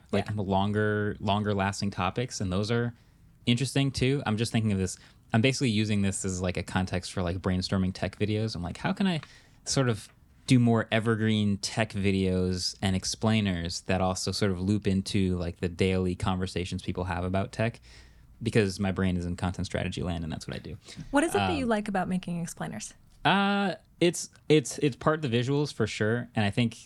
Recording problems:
none

